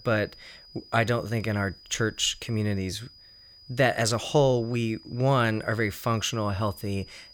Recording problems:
high-pitched whine; faint; throughout; 5 kHz, 20 dB below the speech

